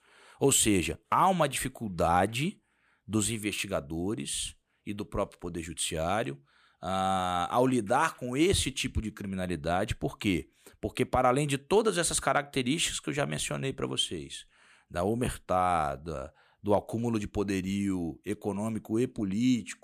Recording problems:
none

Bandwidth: 14.5 kHz